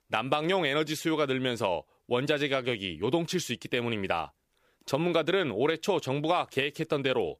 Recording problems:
none

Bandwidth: 15 kHz